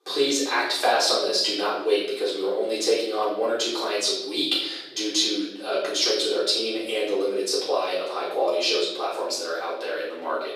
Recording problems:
off-mic speech; far
thin; very; fading below 350 Hz
room echo; noticeable; dies away in 0.7 s

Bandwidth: 15 kHz